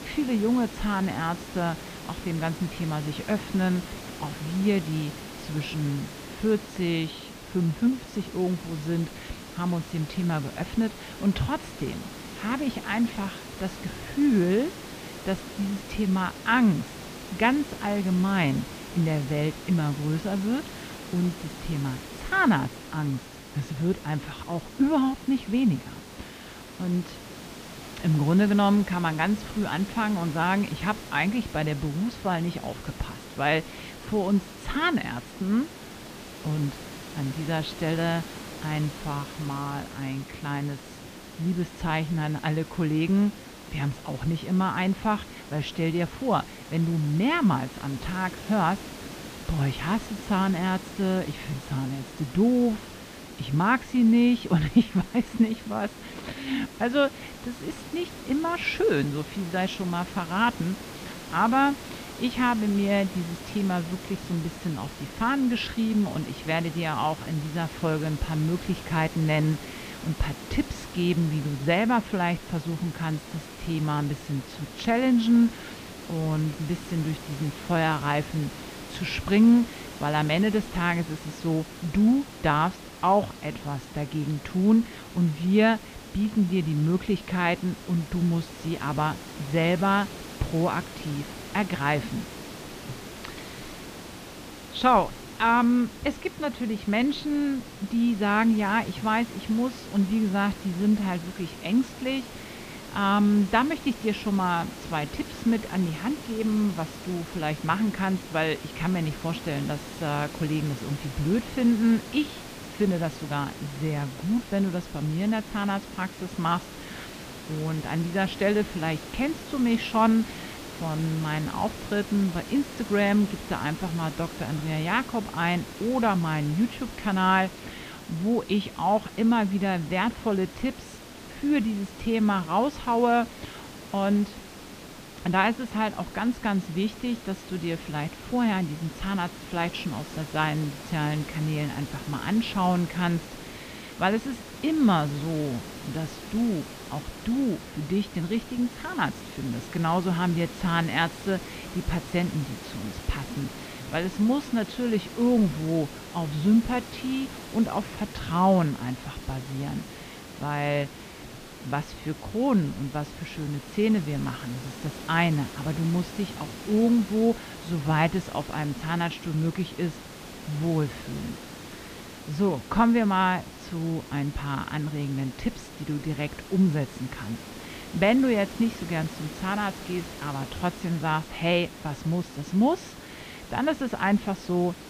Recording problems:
muffled; slightly; fading above 3.5 kHz
hiss; noticeable; throughout; 15 dB below the speech

